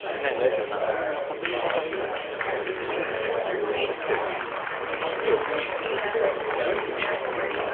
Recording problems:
phone-call audio; nothing above 3 kHz
chatter from many people; very loud; throughout; 5 dB above the speech
traffic noise; very faint; throughout; 20 dB below the speech

